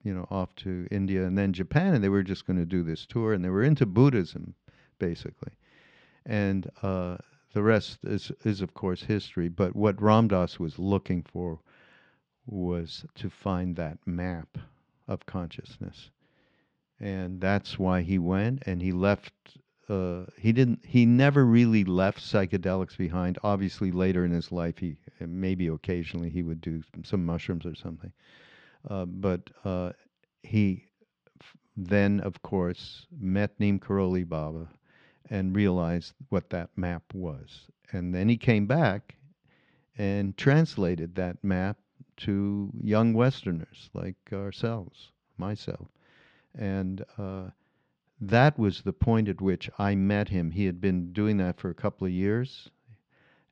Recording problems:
muffled; very slightly; fading above 4 kHz

